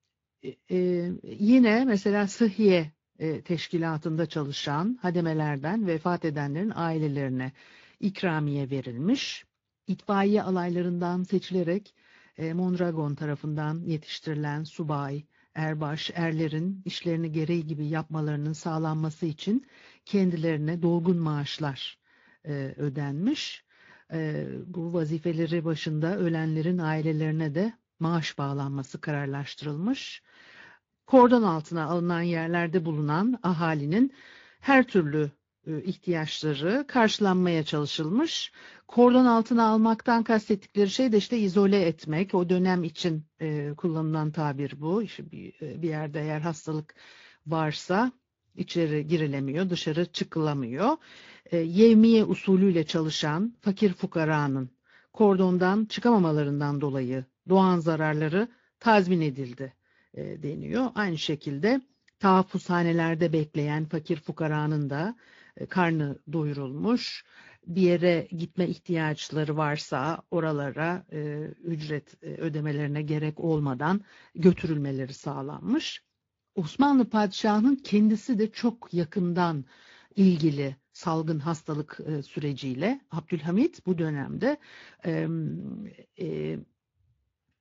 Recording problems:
high frequencies cut off; noticeable; nothing above 7 kHz
garbled, watery; slightly

